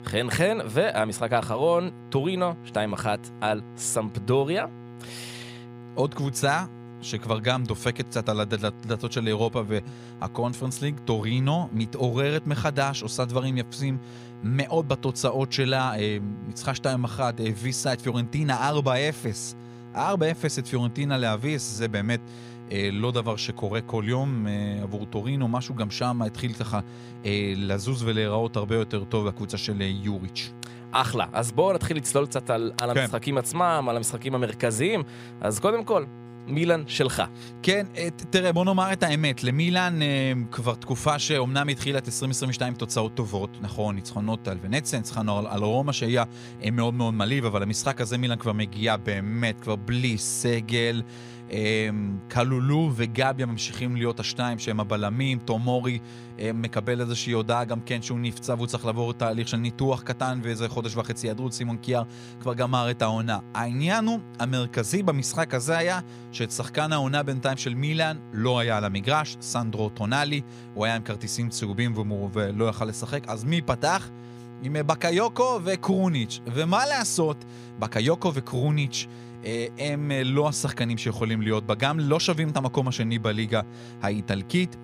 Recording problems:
electrical hum; noticeable; throughout; 60 Hz, 20 dB below the speech

